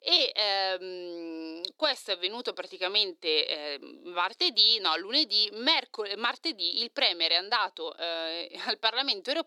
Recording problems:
thin; somewhat; fading below 350 Hz

